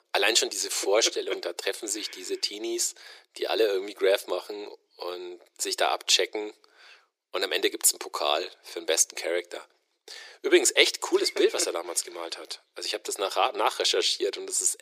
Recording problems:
thin; very; fading below 350 Hz

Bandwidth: 15 kHz